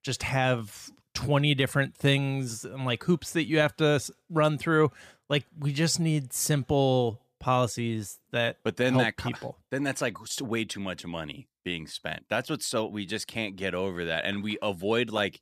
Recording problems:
none

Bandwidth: 14.5 kHz